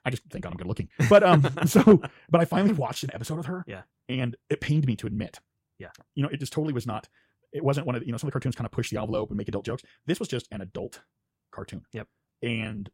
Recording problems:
wrong speed, natural pitch; too fast; 1.6 times normal speed

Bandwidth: 16 kHz